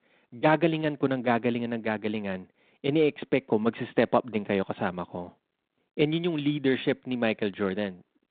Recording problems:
phone-call audio; nothing above 4 kHz

